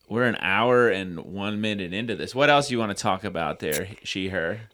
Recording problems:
none

